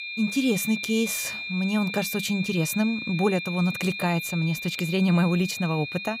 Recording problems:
high-pitched whine; loud; throughout; 2.5 kHz, 6 dB below the speech

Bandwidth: 15.5 kHz